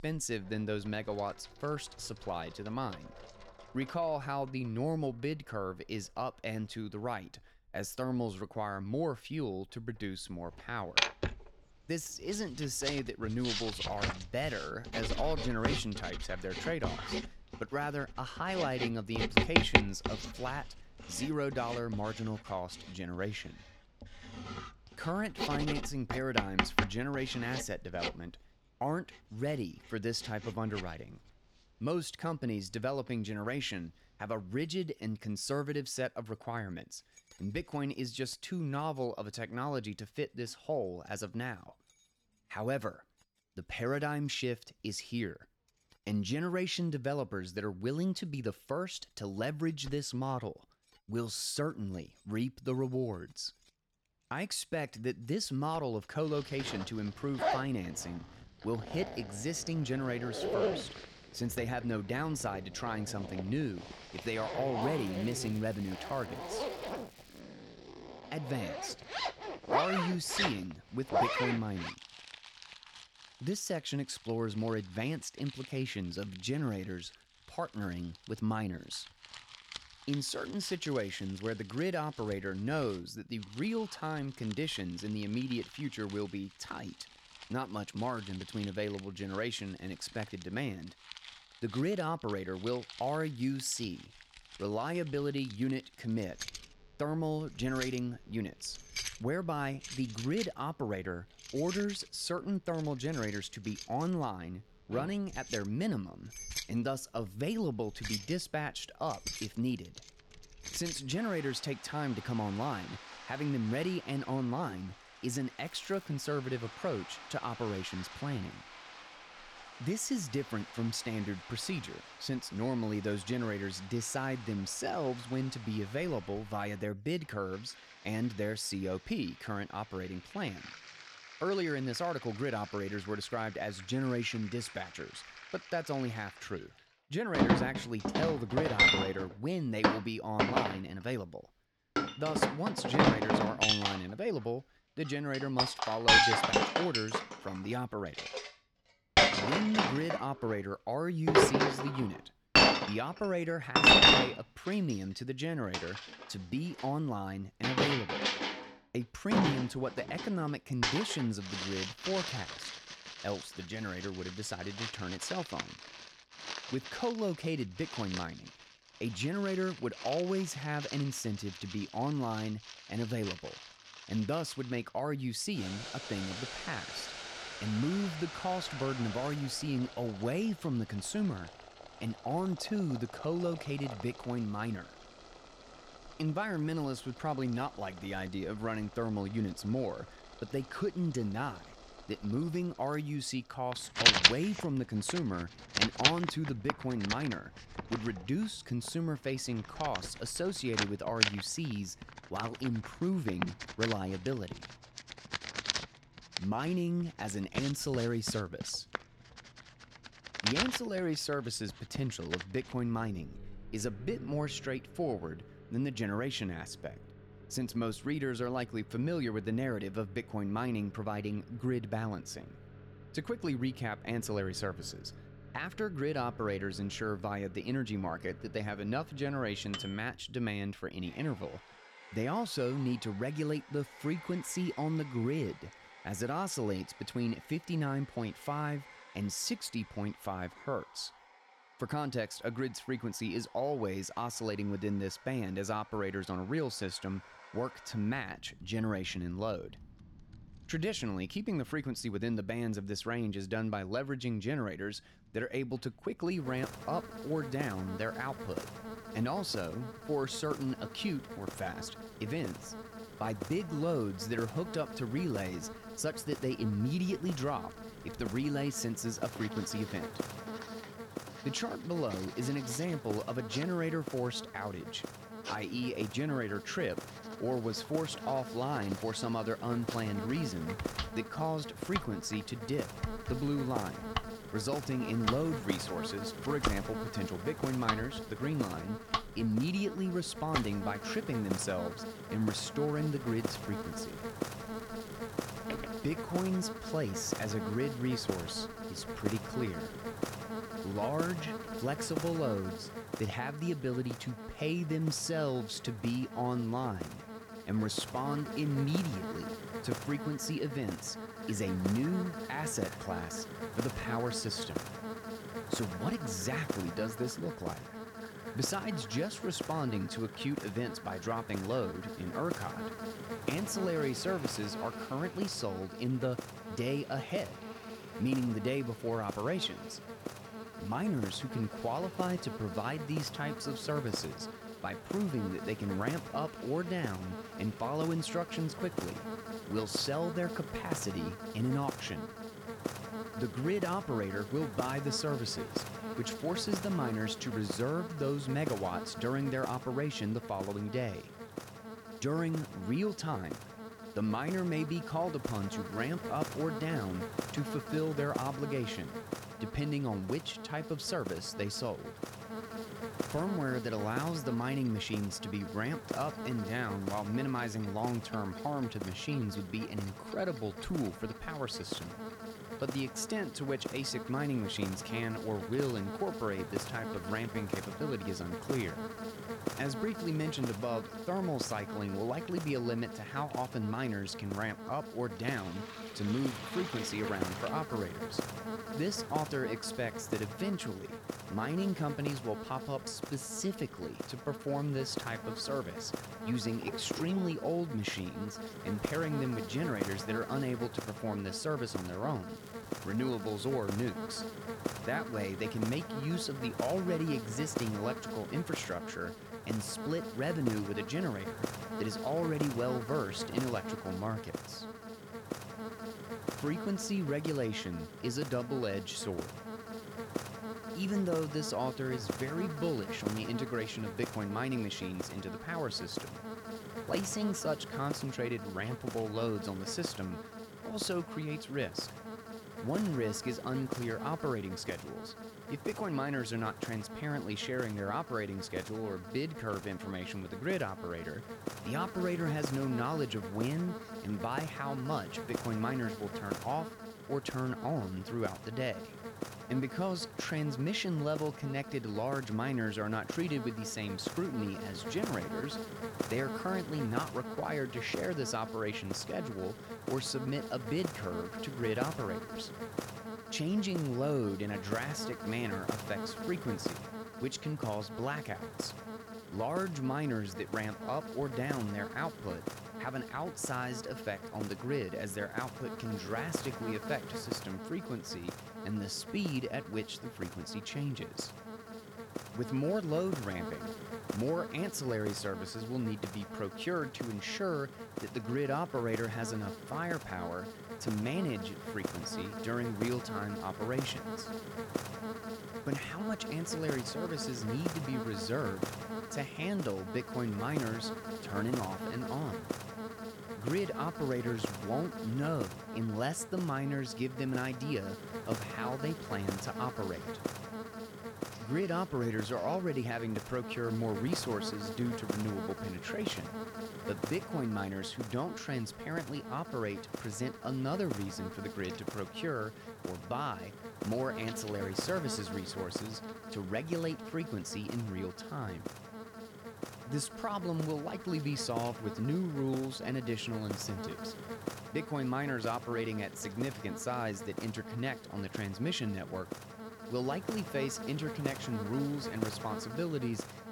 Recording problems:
household noises; very loud; throughout; 1 dB above the speech
electrical hum; loud; from 4:16 on; 50 Hz, 6 dB below the speech
crackling; faint; 4 times, first at 1:05; 25 dB below the speech

